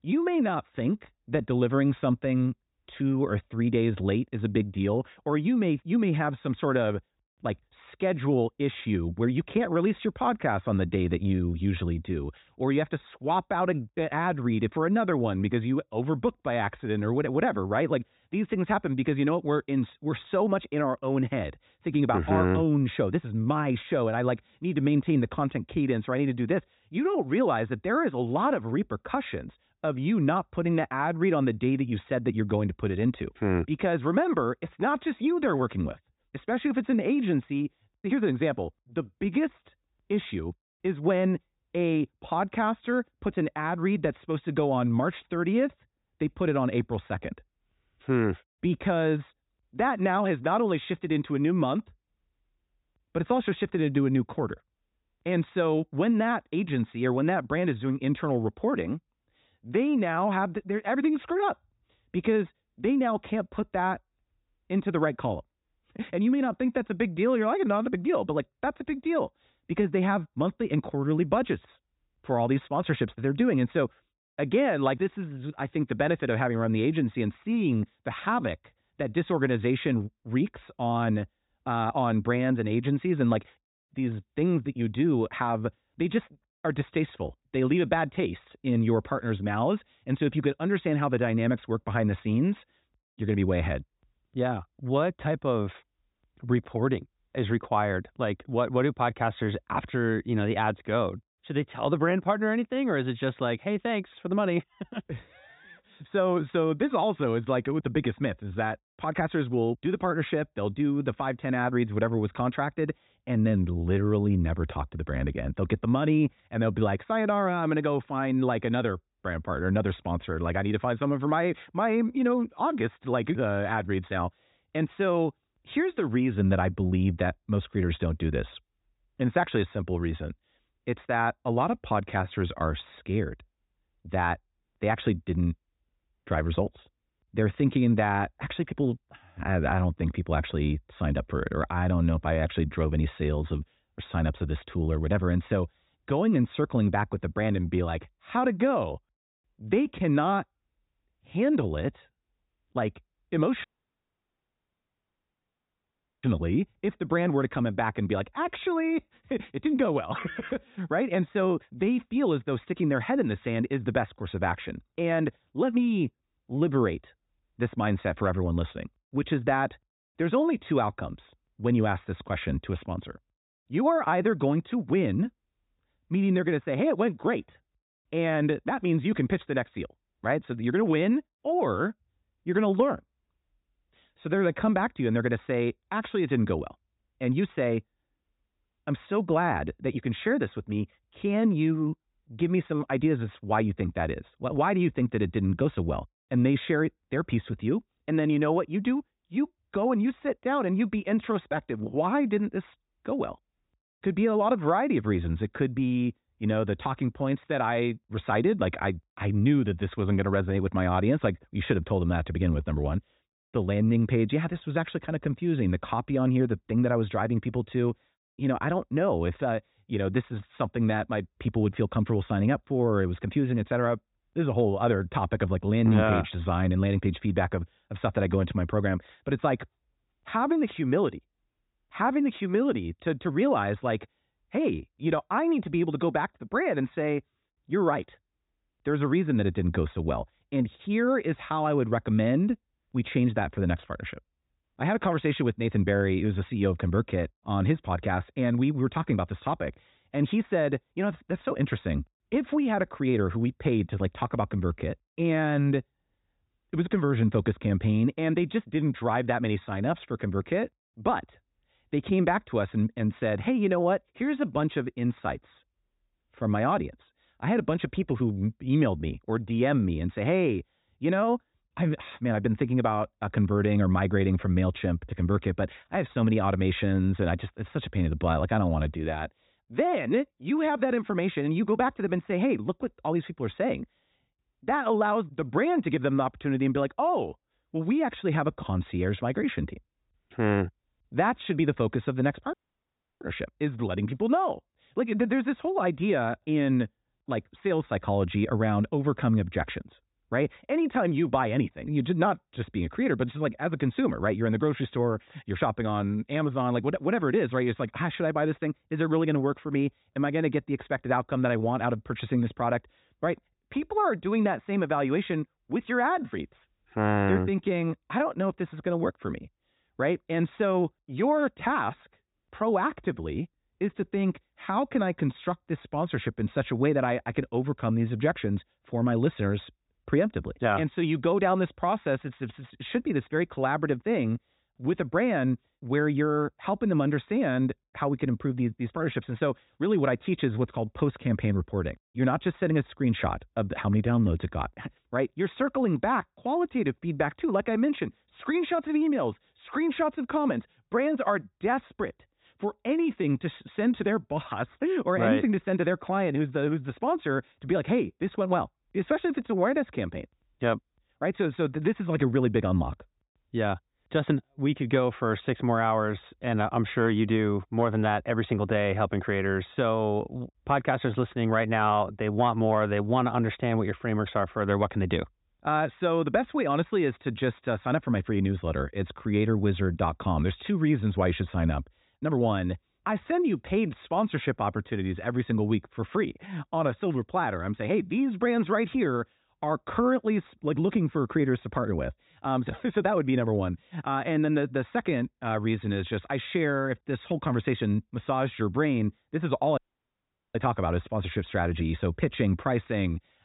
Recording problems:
high frequencies cut off; severe; nothing above 4 kHz
audio cutting out; at 2:34 for 2.5 s, at 4:53 for 0.5 s and at 6:40 for 1 s

